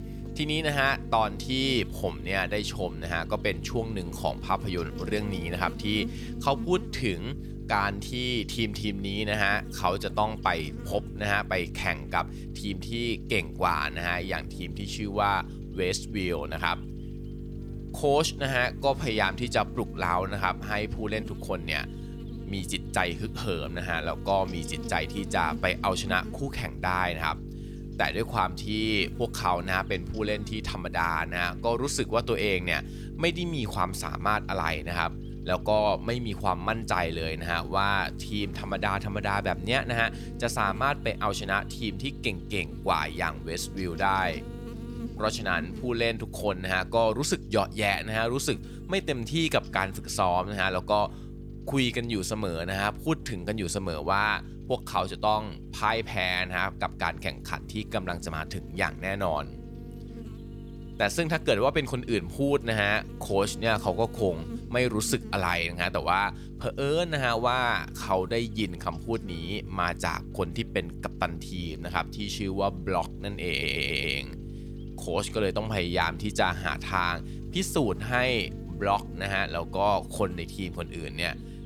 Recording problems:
electrical hum; noticeable; throughout; 50 Hz, 20 dB below the speech
audio stuttering; at 1:13

